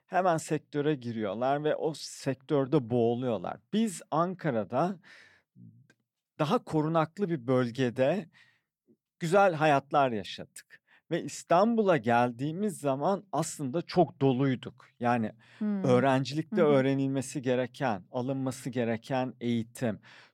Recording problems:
none

